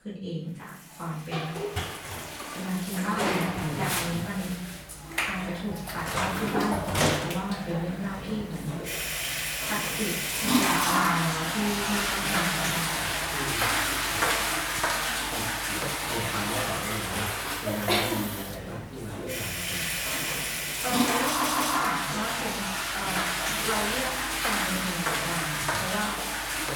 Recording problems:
off-mic speech; far
room echo; noticeable; dies away in 0.5 s
household noises; very loud; throughout; 7 dB above the speech
audio stuttering; at 21 s

